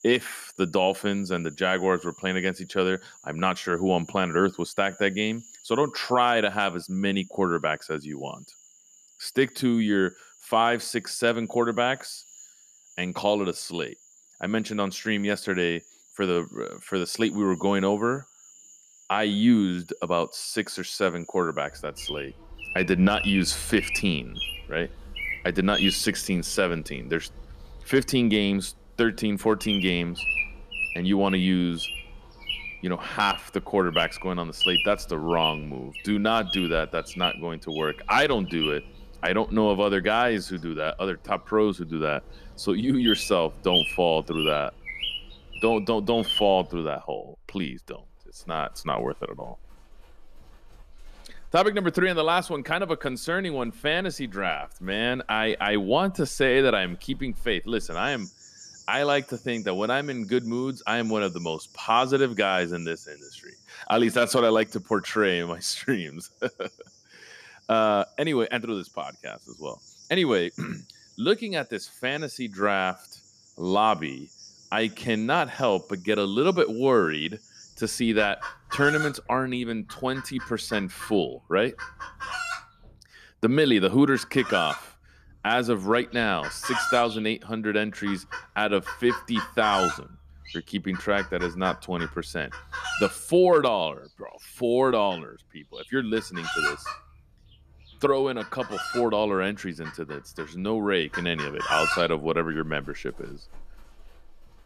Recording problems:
animal sounds; loud; throughout; 6 dB below the speech

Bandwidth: 14.5 kHz